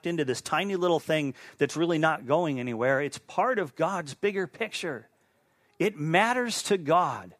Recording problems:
none

